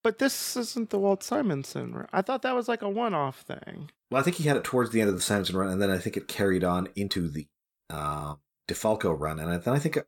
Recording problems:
uneven, jittery; strongly; from 1 to 9 s

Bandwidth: 18 kHz